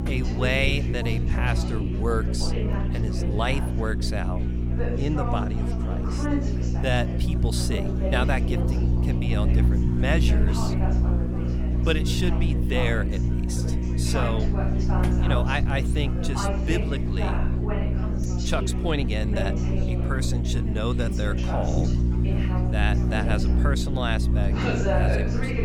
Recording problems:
electrical hum; loud; throughout; 60 Hz, 6 dB below the speech
chatter from many people; loud; throughout; 5 dB below the speech

